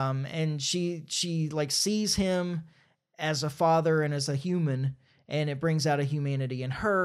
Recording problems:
abrupt cut into speech; at the start and the end

